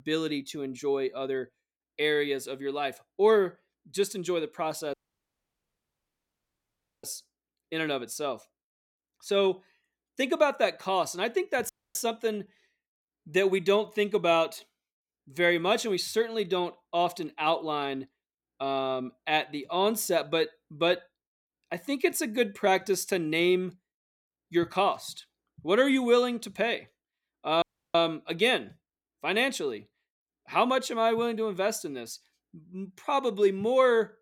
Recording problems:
audio cutting out; at 5 s for 2 s, at 12 s and at 28 s

